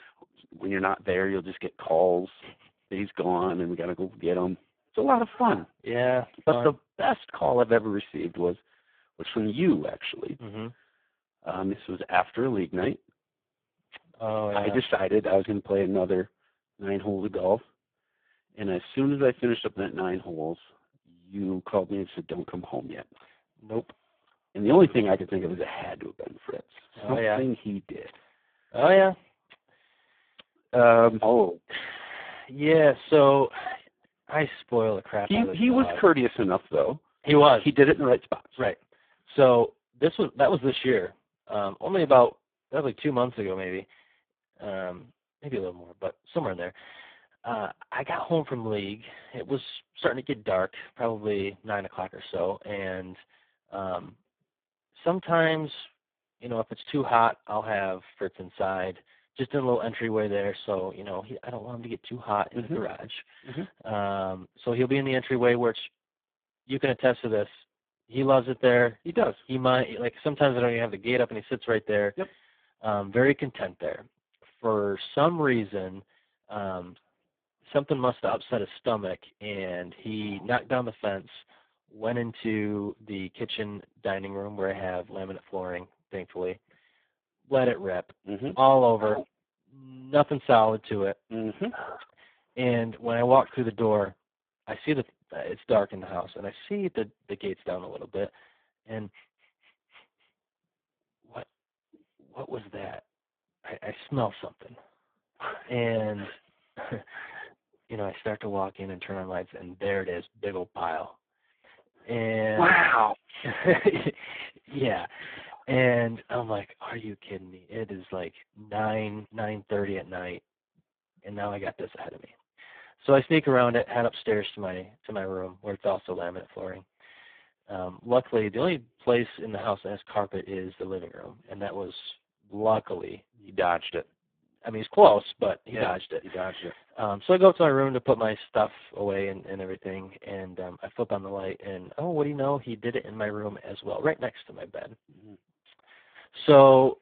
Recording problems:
phone-call audio; poor line

